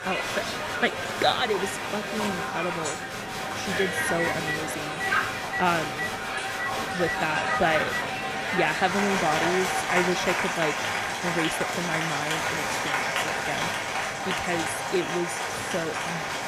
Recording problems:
crowd noise; very loud; throughout; 2 dB above the speech
background music; noticeable; throughout; 10 dB below the speech
background chatter; noticeable; throughout; 4 voices, 15 dB below the speech
phone ringing; noticeable; from 4 to 8 s; peak 2 dB below the speech

